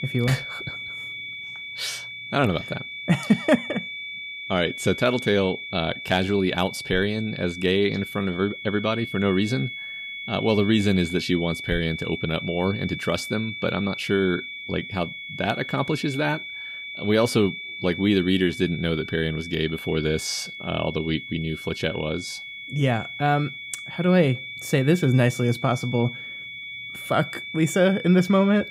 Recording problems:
high-pitched whine; loud; throughout; 2.5 kHz, 9 dB below the speech

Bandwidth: 15.5 kHz